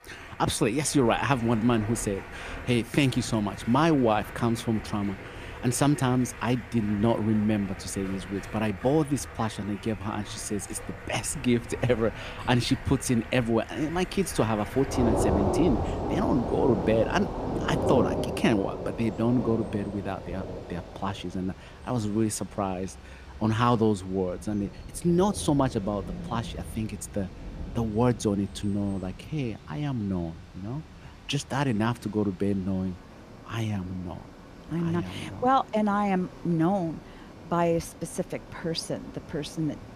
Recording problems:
rain or running water; loud; throughout; 9 dB below the speech

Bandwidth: 14.5 kHz